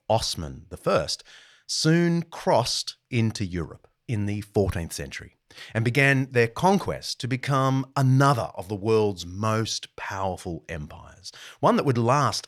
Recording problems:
none

